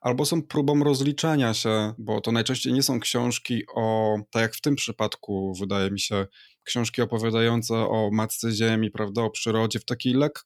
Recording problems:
none

